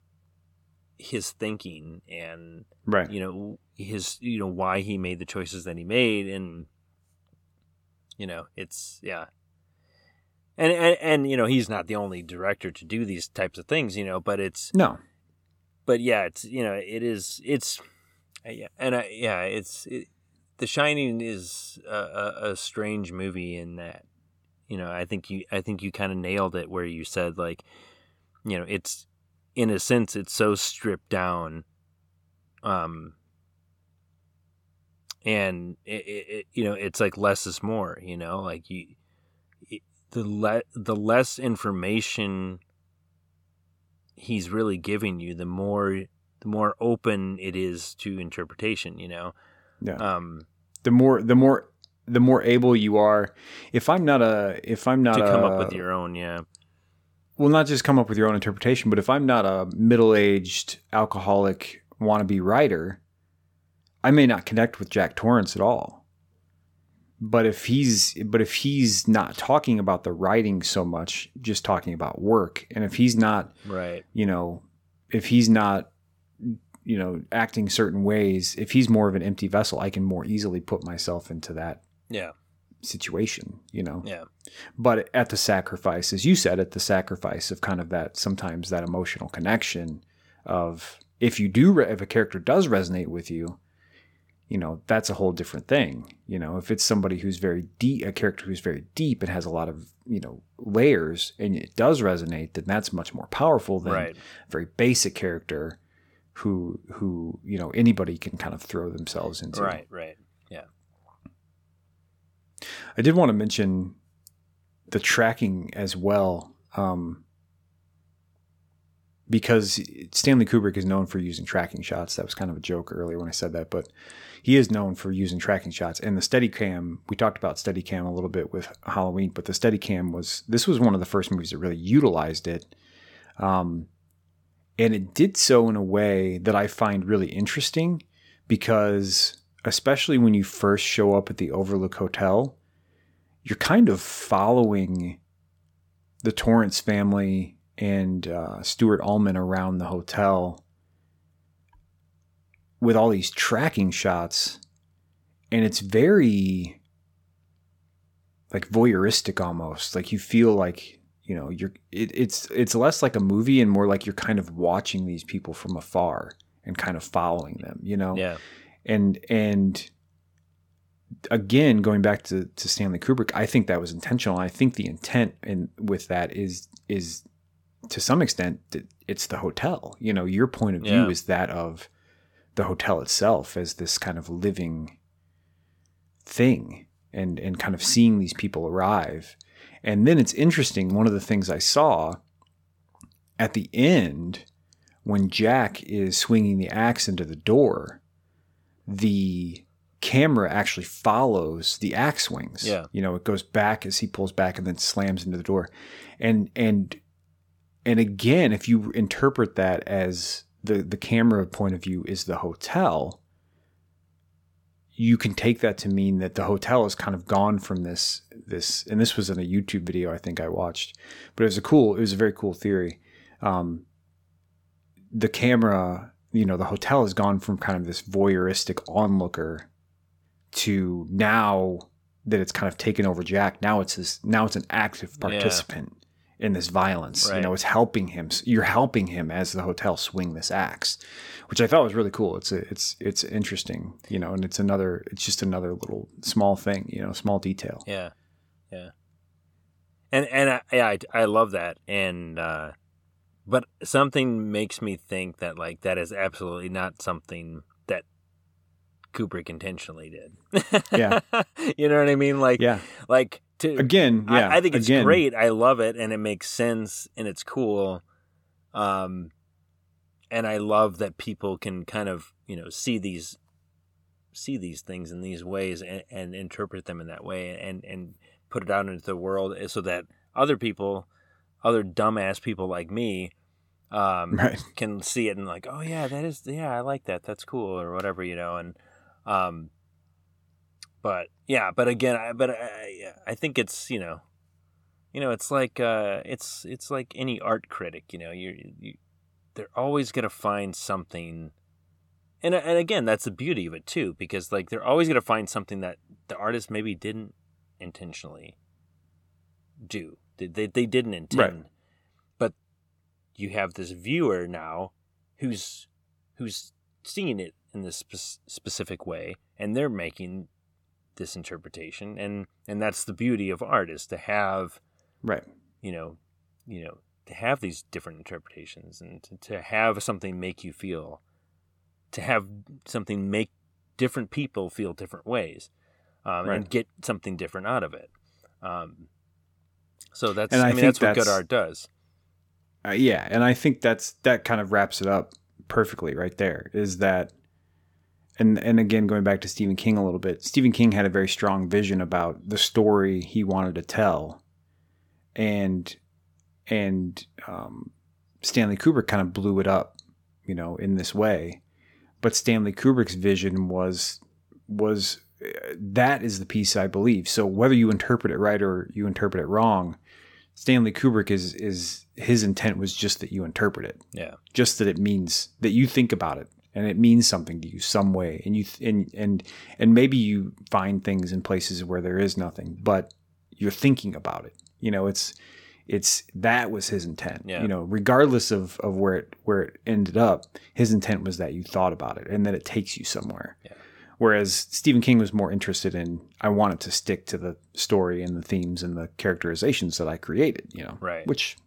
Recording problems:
none

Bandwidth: 17.5 kHz